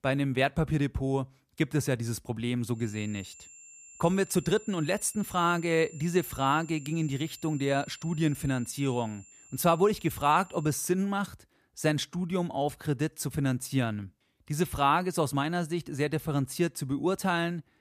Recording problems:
high-pitched whine; faint; from 3 to 11 s; 7.5 kHz, 20 dB below the speech

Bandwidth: 14.5 kHz